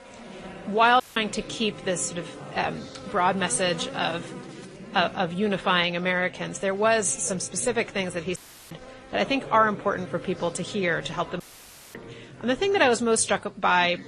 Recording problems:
garbled, watery; slightly; nothing above 10.5 kHz
chatter from many people; noticeable; throughout; 20 dB below the speech
electrical hum; faint; throughout; 60 Hz, 20 dB below the speech
audio cutting out; at 1 s, at 8.5 s and at 11 s for 0.5 s

